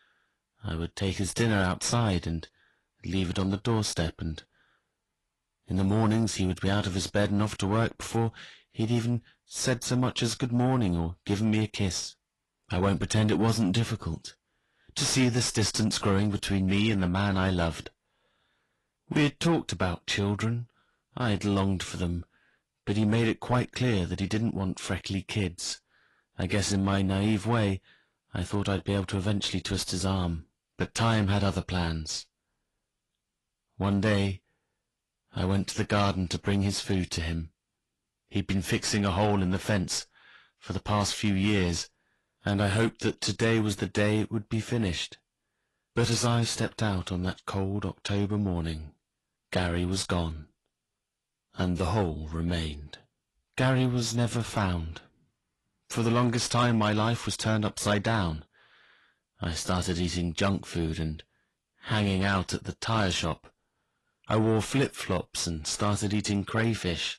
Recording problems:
distortion; slight; 10 dB below the speech
garbled, watery; slightly; nothing above 11.5 kHz

